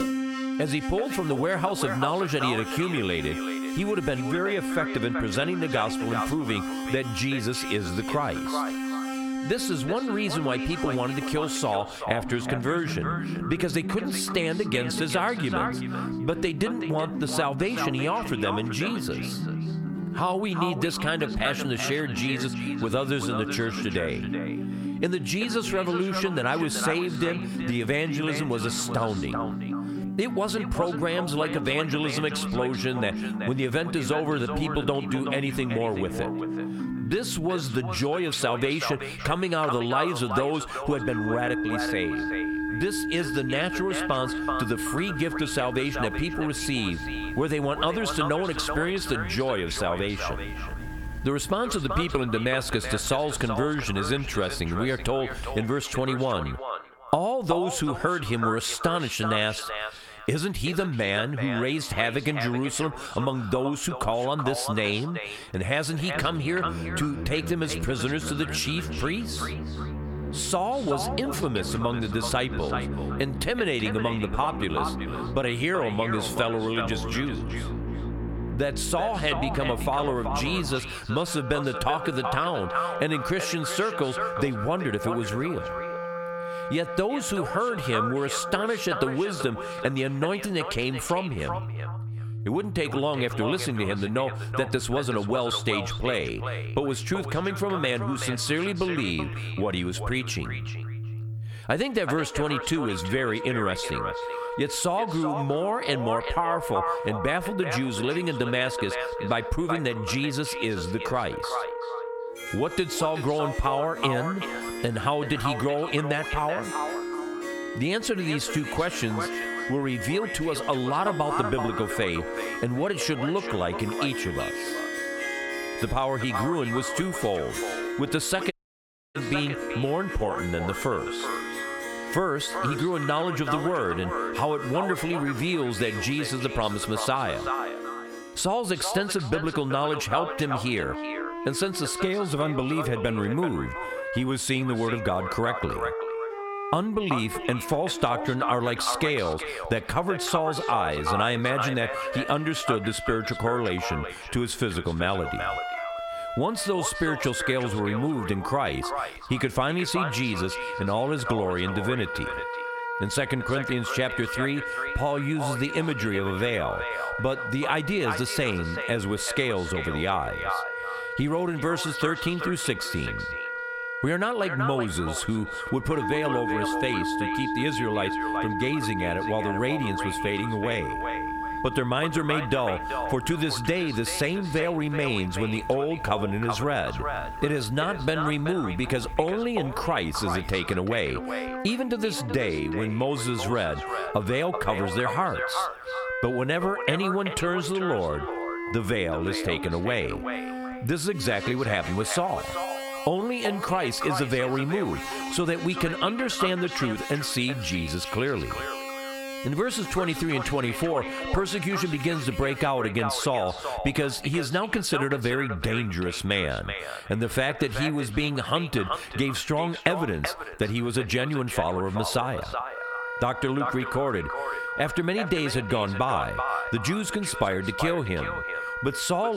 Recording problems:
echo of what is said; strong; throughout; 380 ms later, 8 dB below the speech
squashed, flat; heavily, background pumping
background music; loud; throughout; 8 dB below the speech
audio cutting out; at 2:09 for 0.5 s
abrupt cut into speech; at the end

